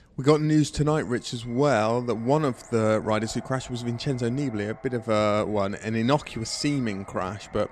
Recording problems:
echo of what is said; faint; throughout; 360 ms later, 25 dB below the speech

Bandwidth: 13 kHz